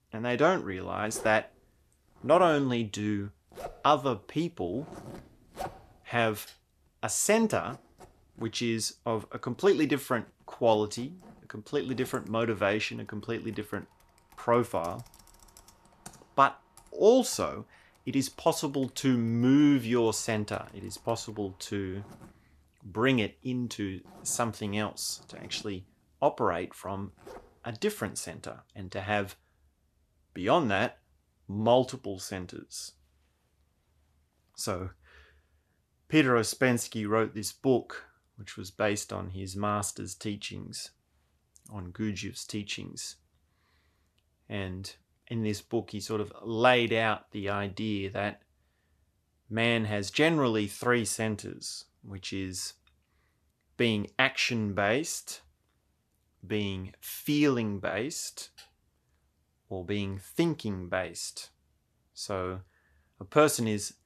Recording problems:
household noises; faint; until 28 s; 20 dB below the speech

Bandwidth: 14 kHz